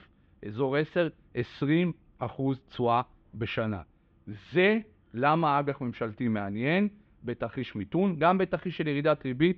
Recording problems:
muffled; very; fading above 3.5 kHz

